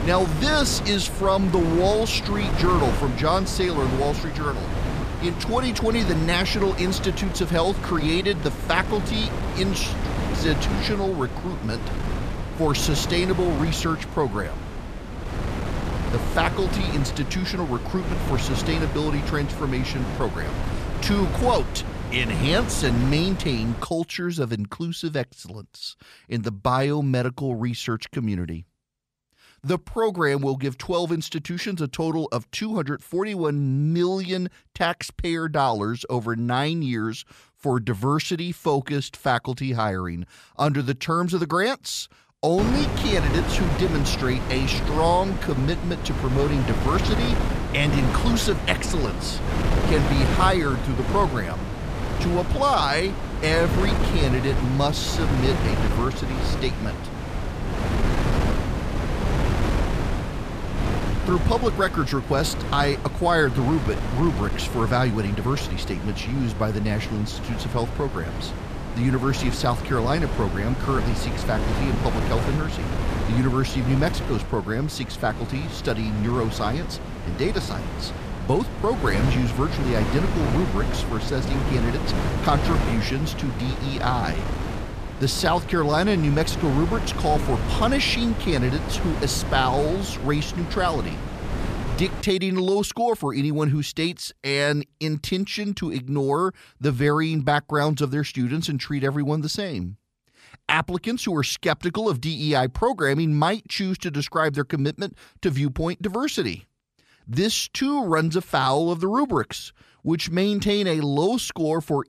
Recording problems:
wind noise on the microphone; heavy; until 24 s and from 43 s to 1:32; 6 dB below the speech

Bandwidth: 14.5 kHz